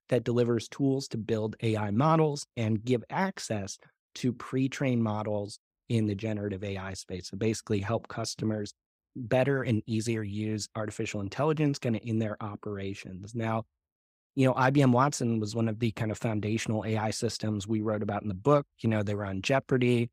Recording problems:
none

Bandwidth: 15.5 kHz